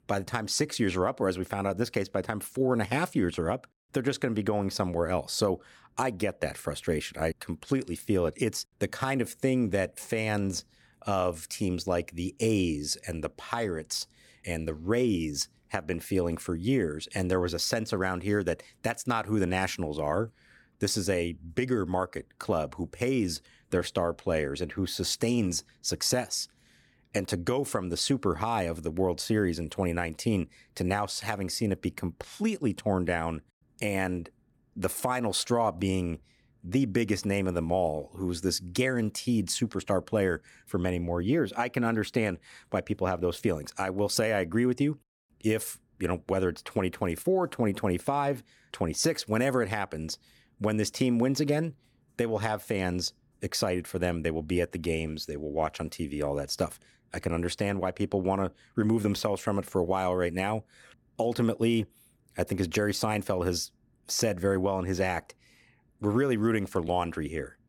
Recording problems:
none

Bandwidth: 18.5 kHz